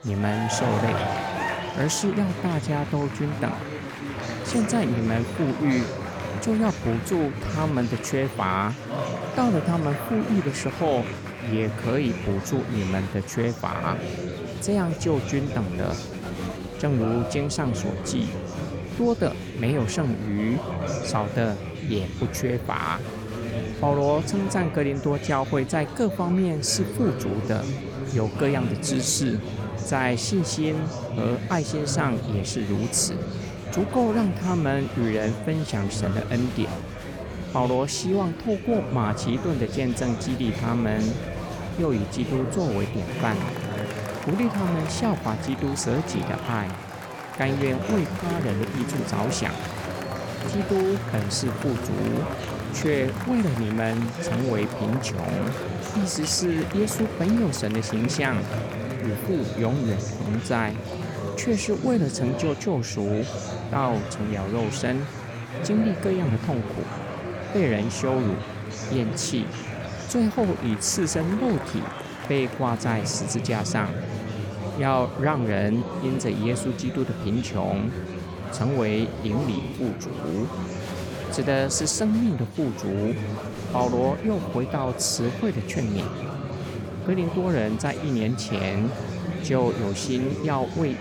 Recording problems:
murmuring crowd; loud; throughout; 6 dB below the speech

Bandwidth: 18.5 kHz